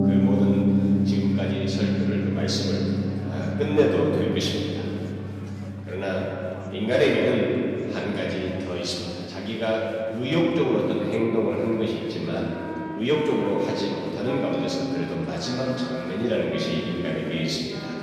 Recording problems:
off-mic speech; far
room echo; noticeable; dies away in 3 s
background music; loud; throughout; 2 dB below the speech
chatter from many people; faint; throughout; 20 dB below the speech

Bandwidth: 14.5 kHz